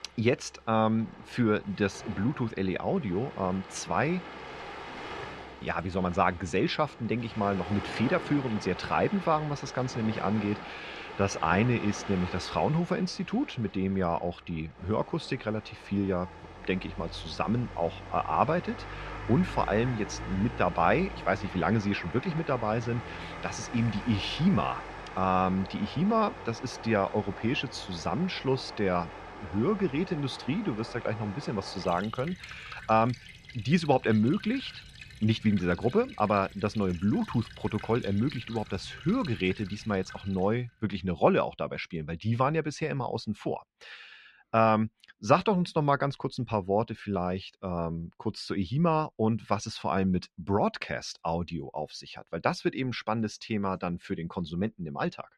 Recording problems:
muffled; slightly; fading above 3 kHz
rain or running water; noticeable; until 40 s; 15 dB below the speech

